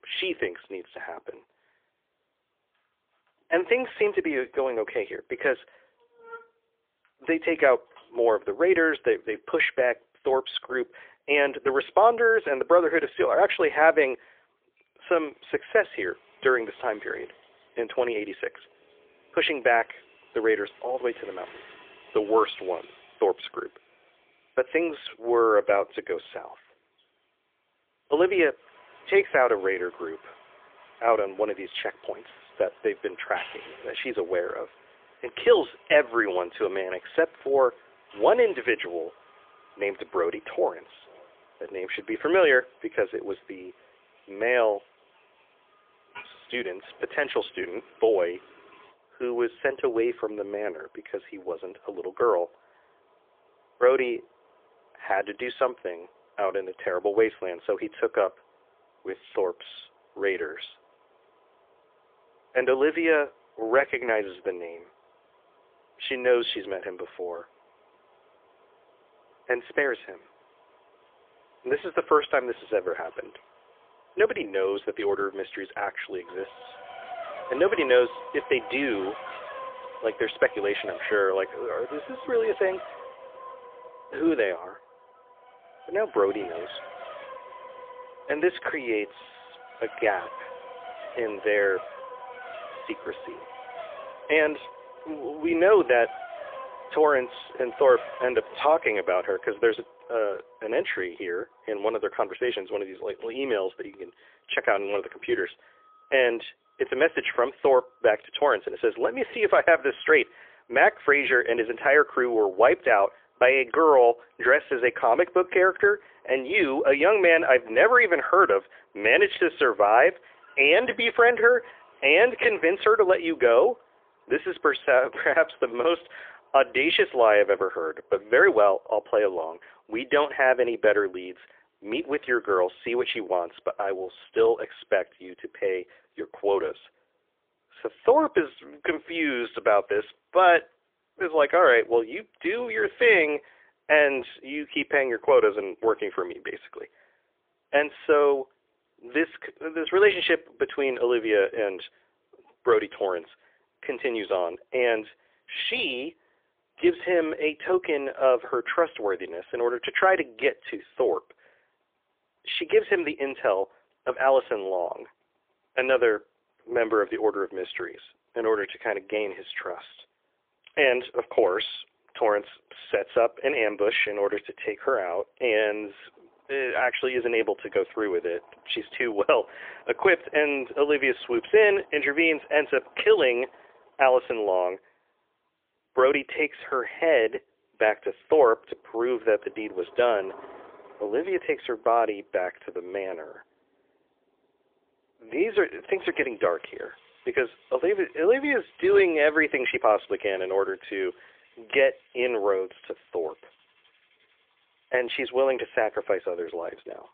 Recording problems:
phone-call audio; poor line; nothing above 3.5 kHz
traffic noise; faint; throughout; 20 dB below the speech

